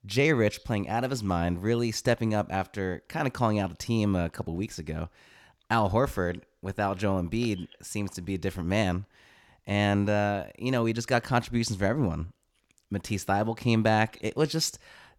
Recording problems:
none

